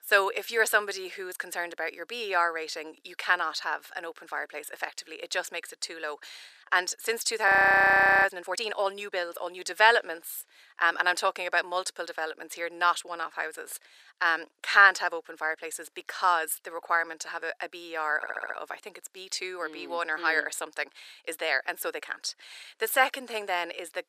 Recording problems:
thin; very; fading below 400 Hz
audio freezing; at 7.5 s for 1 s
audio stuttering; at 18 s

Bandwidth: 14.5 kHz